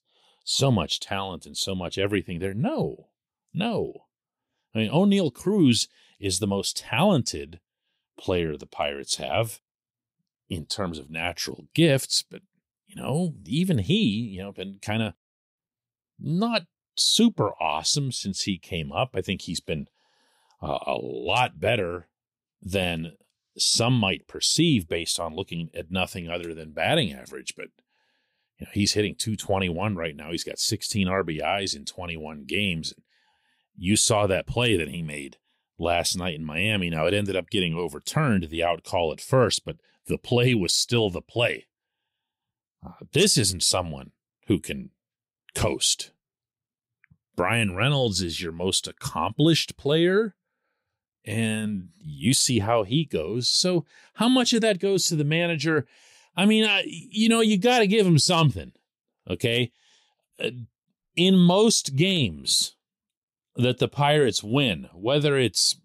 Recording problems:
none

